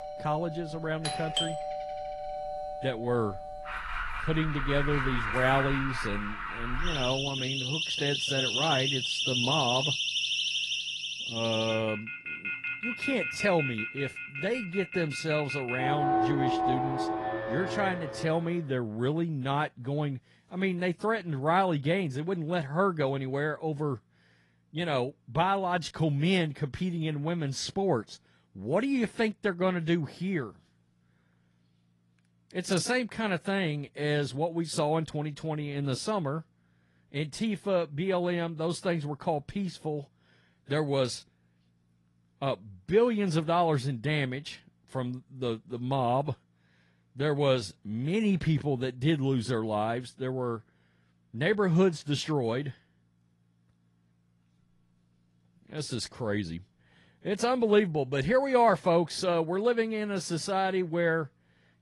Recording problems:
garbled, watery; slightly; nothing above 11 kHz
alarms or sirens; loud; until 18 s; 2 dB below the speech

